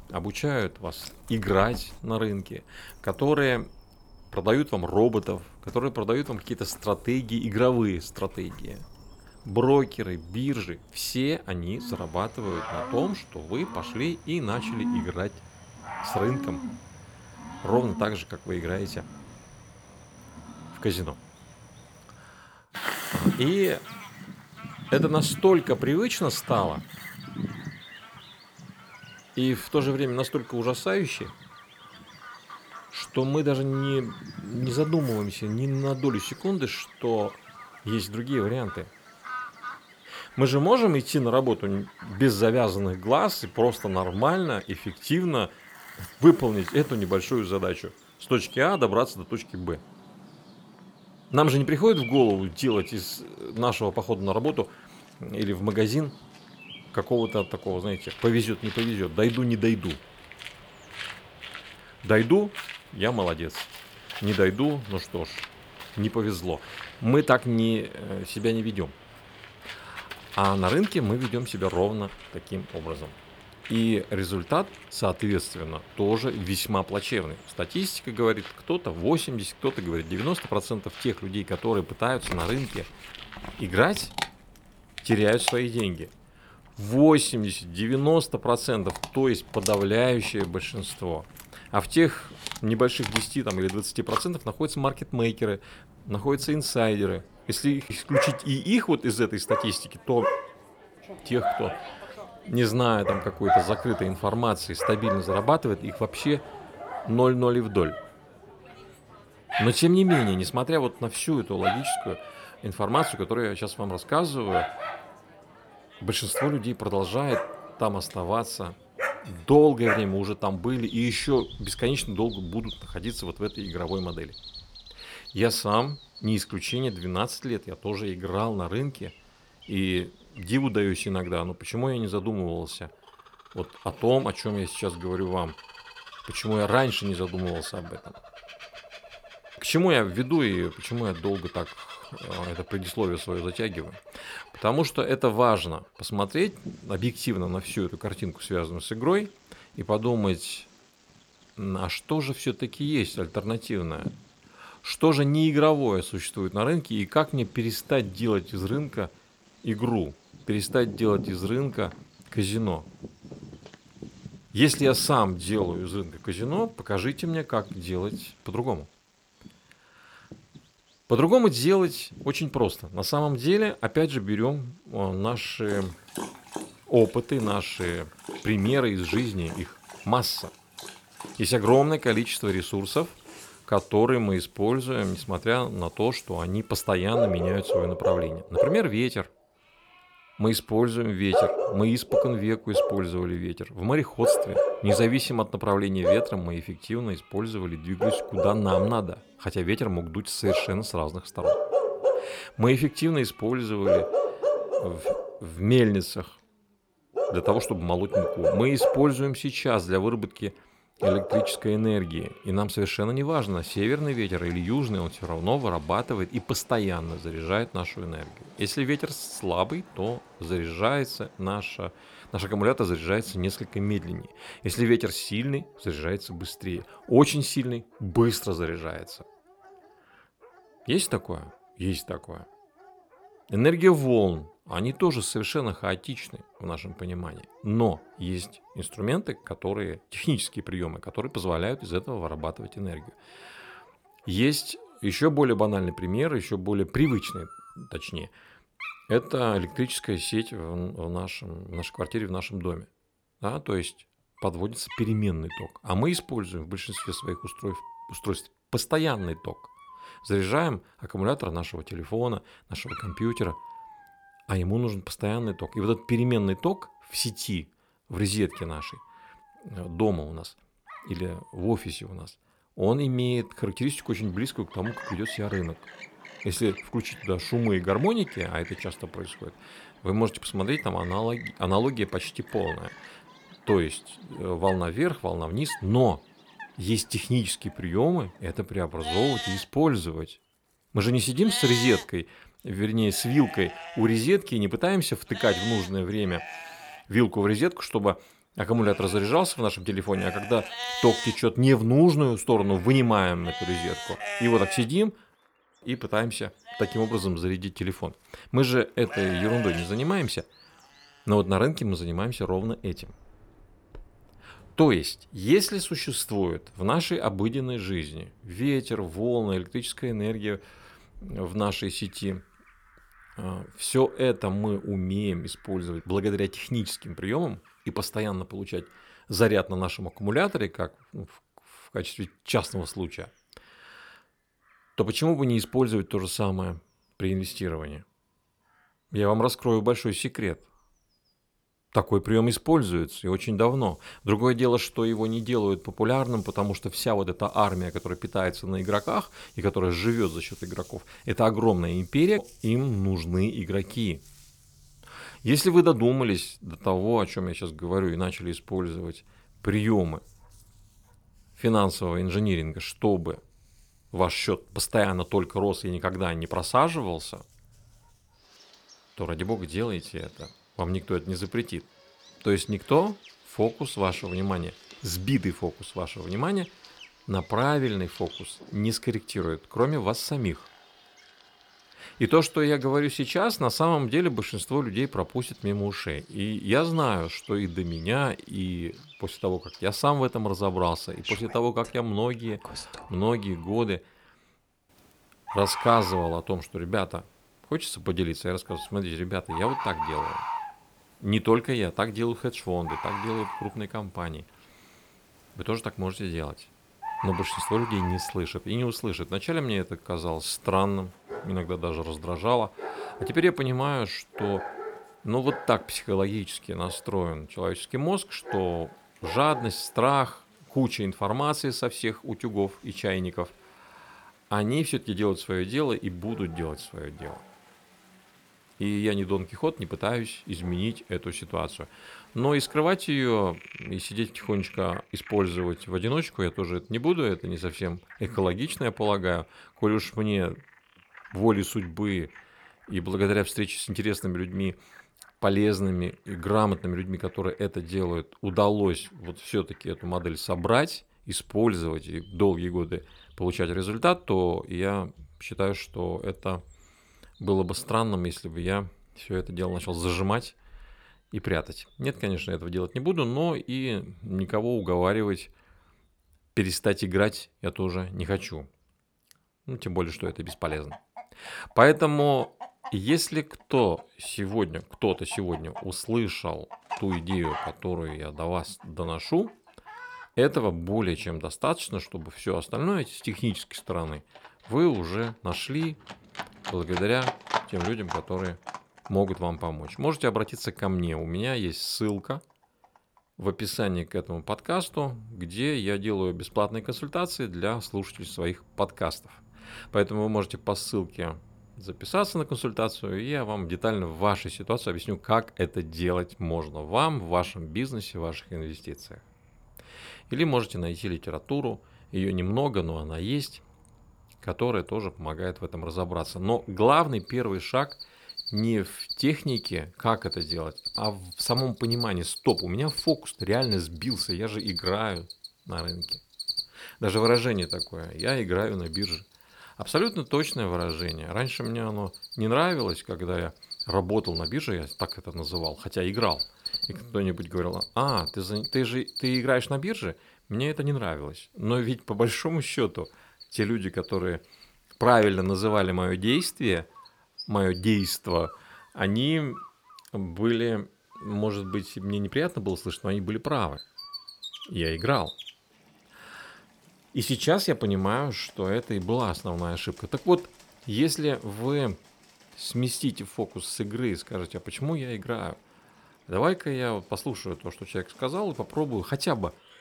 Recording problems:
animal sounds; loud; throughout; 8 dB below the speech

